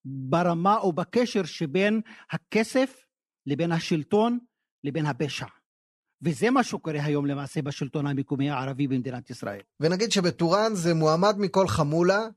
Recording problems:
none

